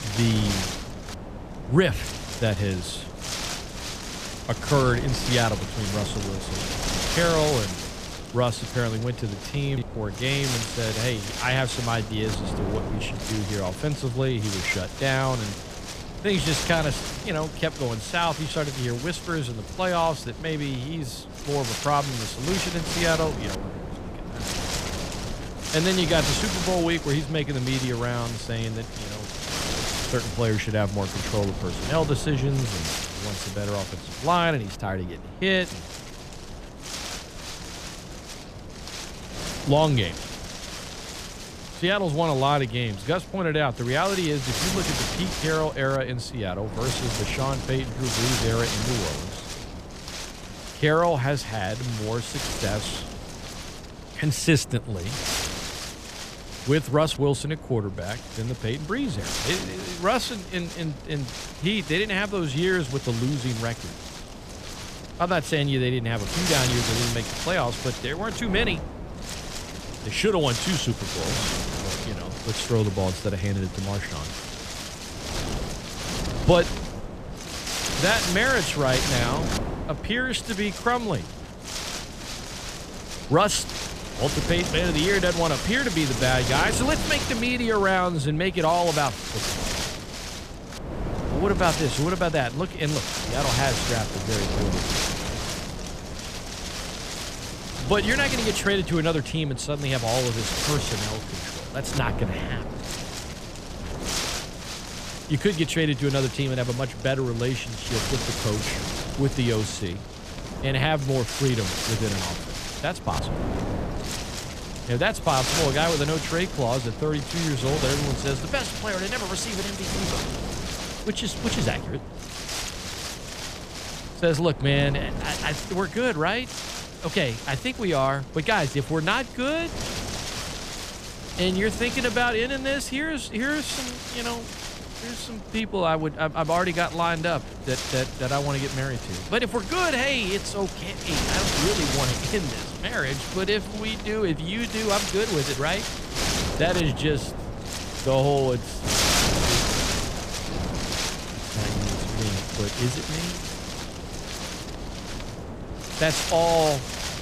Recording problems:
wind noise on the microphone; heavy; 5 dB below the speech

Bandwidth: 14.5 kHz